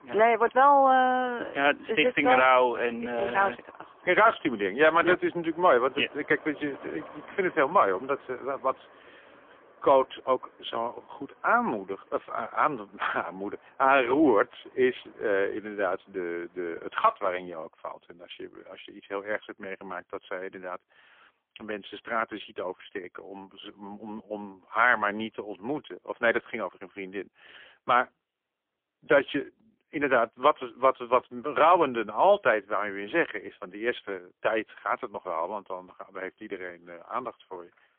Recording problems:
phone-call audio; poor line; nothing above 3.5 kHz
traffic noise; faint; until 17 s; 25 dB below the speech

